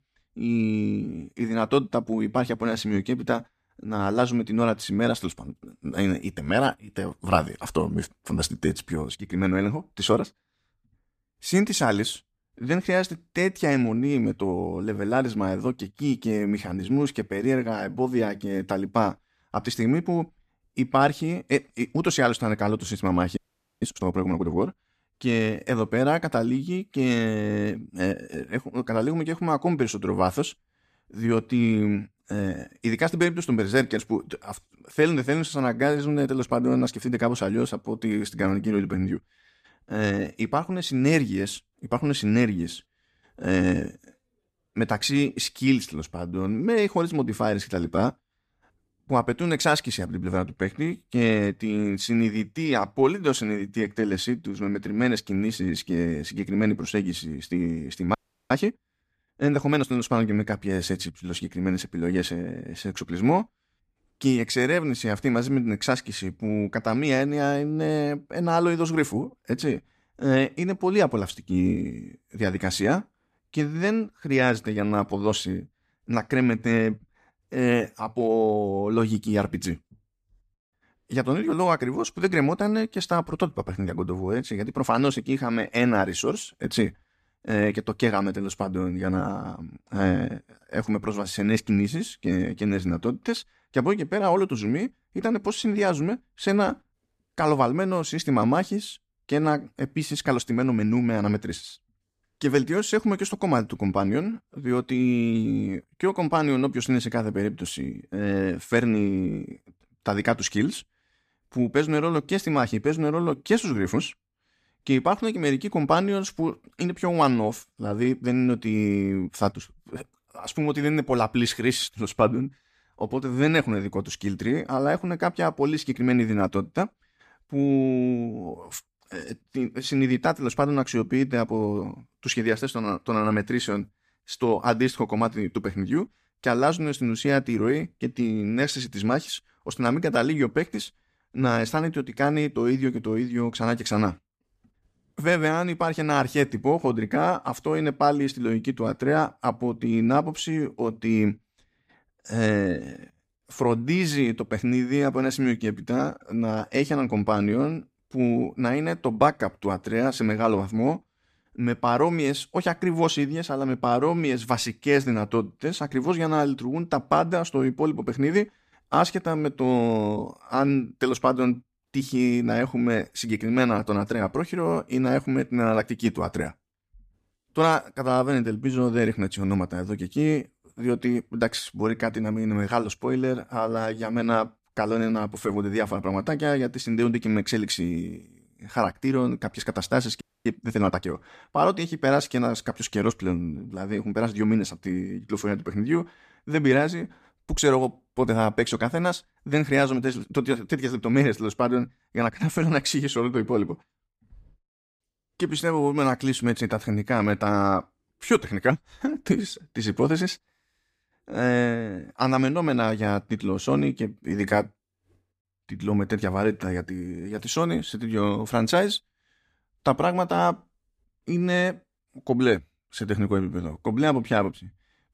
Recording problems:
audio freezing; at 23 s, at 58 s and at 3:10

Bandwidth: 14.5 kHz